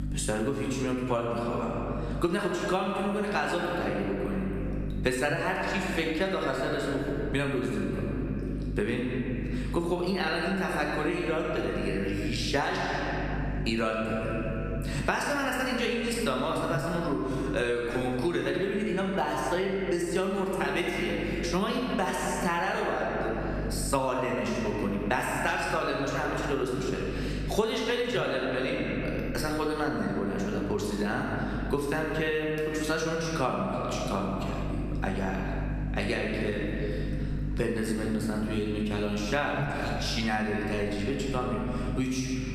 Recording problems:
squashed, flat; heavily
room echo; noticeable; dies away in 1.7 s
off-mic speech; somewhat distant
electrical hum; noticeable; throughout; 50 Hz, 20 dB below the speech

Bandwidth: 14.5 kHz